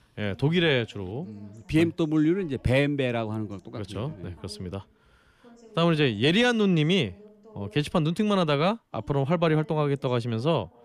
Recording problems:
voice in the background; faint; throughout; 25 dB below the speech

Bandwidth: 14.5 kHz